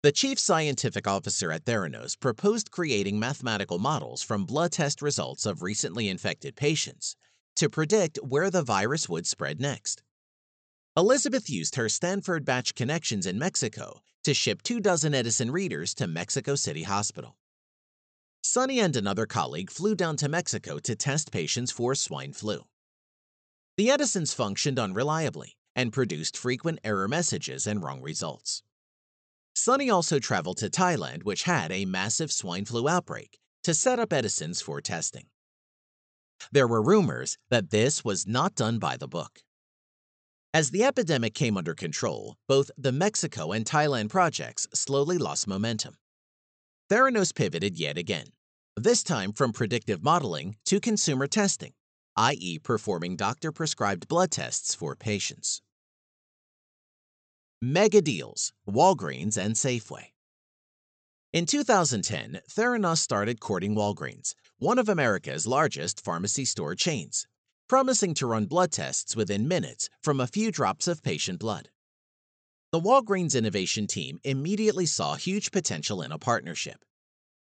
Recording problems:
high frequencies cut off; noticeable; nothing above 8 kHz

